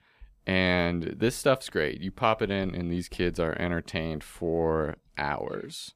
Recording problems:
none

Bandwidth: 15 kHz